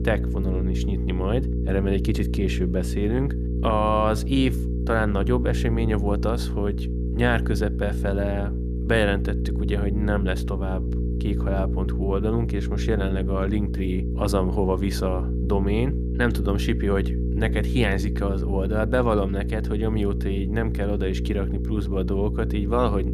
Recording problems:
electrical hum; loud; throughout; 60 Hz, 9 dB below the speech

